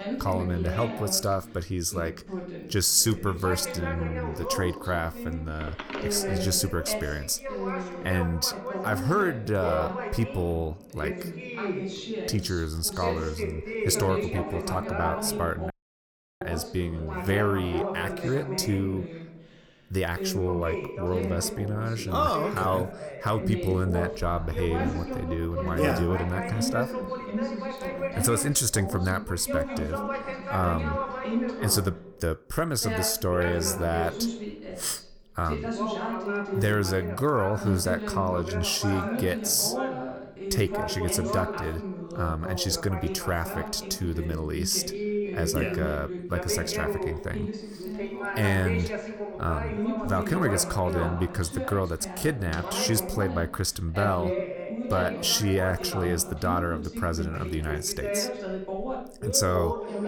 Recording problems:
background chatter; loud; throughout; 2 voices, 5 dB below the speech
audio cutting out; at 16 s for 0.5 s

